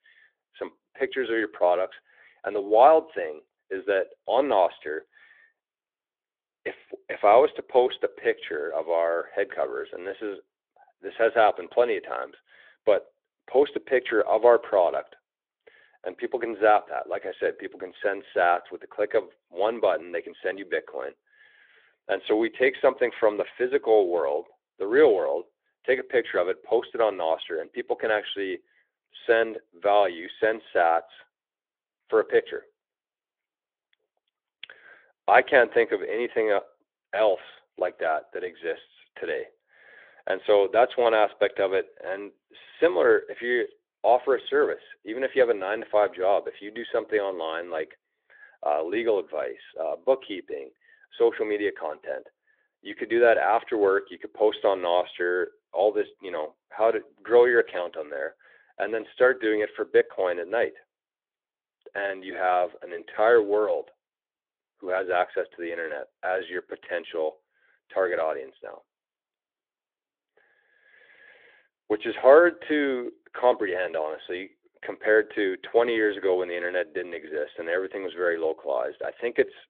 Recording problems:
phone-call audio; nothing above 3.5 kHz

